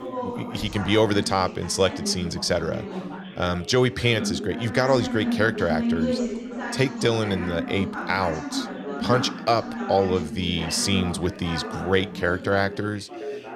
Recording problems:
background chatter; loud; throughout; 4 voices, 7 dB below the speech

